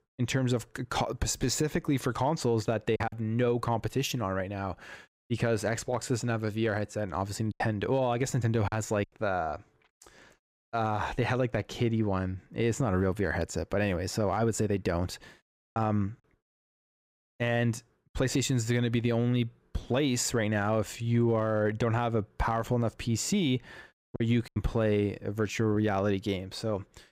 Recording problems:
choppy; occasionally; 2% of the speech affected

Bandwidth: 15.5 kHz